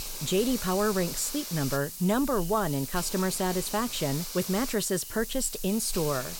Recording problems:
hiss; loud; throughout; 7 dB below the speech

